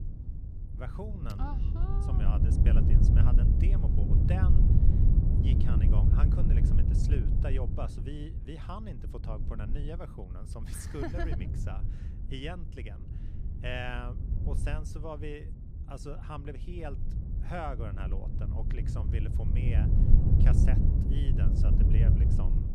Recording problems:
wind noise on the microphone; heavy; 1 dB above the speech

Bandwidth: 15 kHz